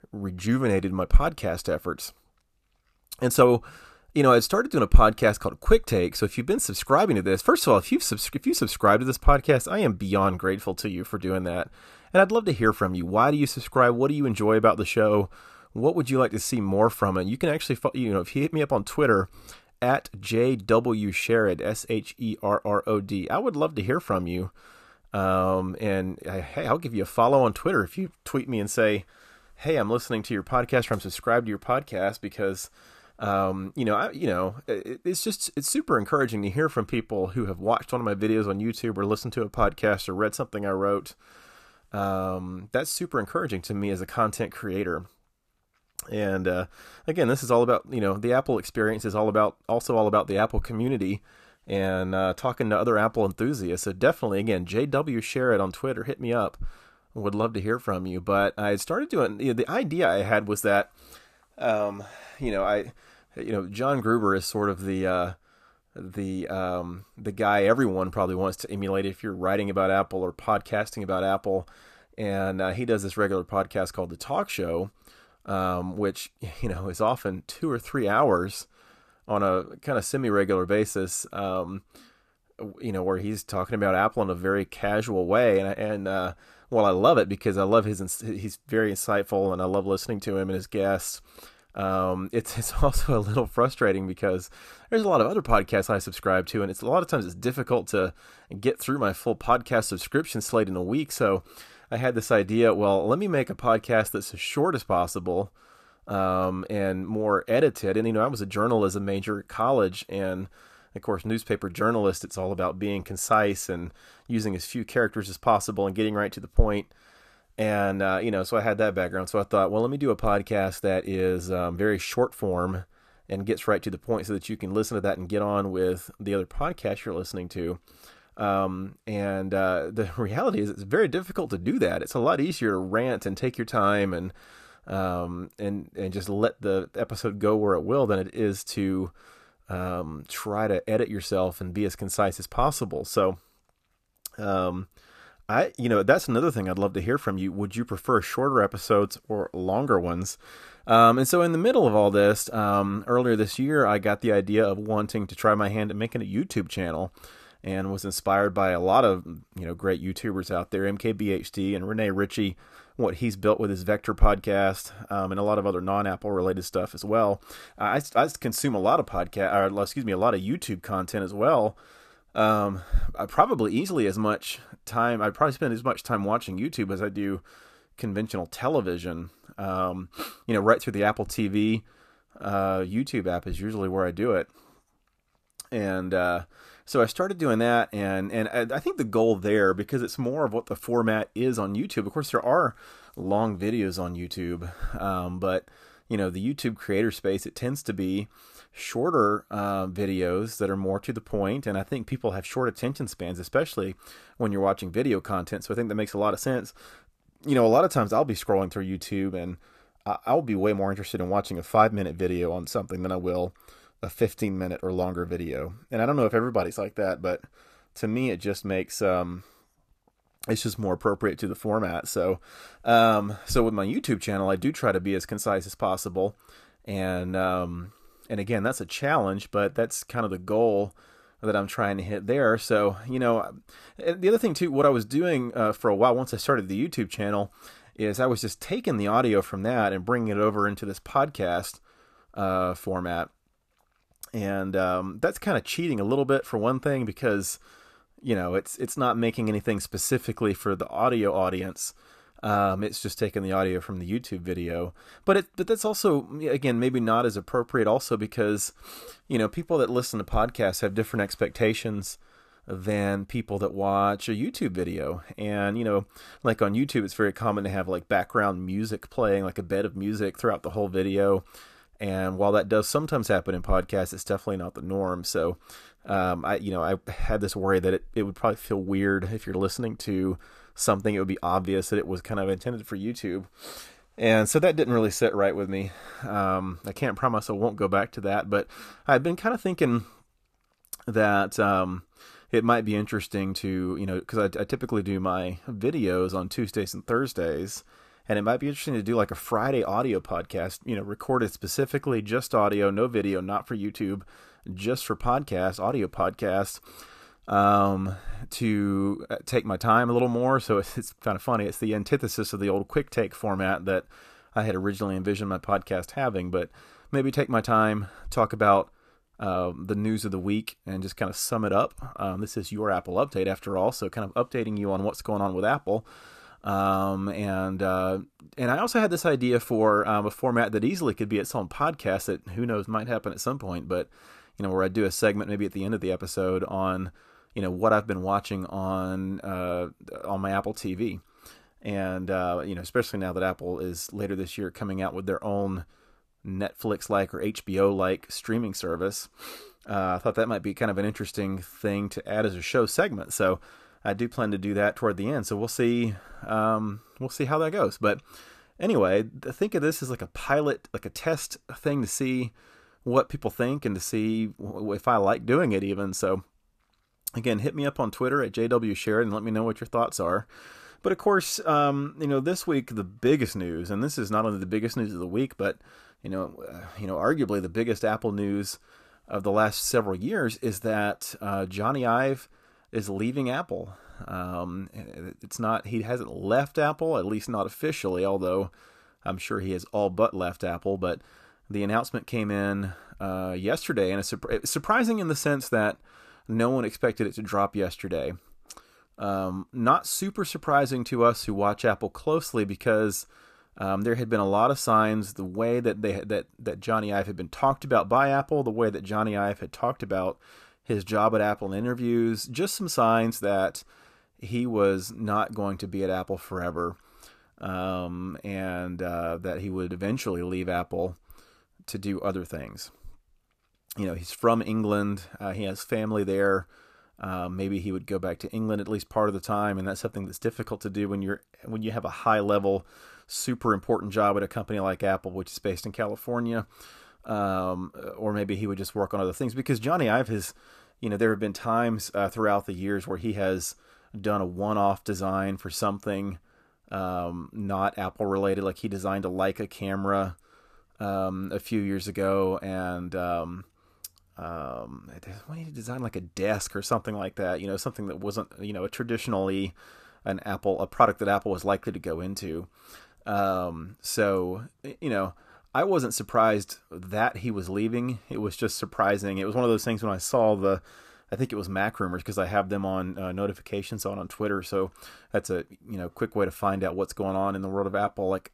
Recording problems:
none

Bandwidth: 14.5 kHz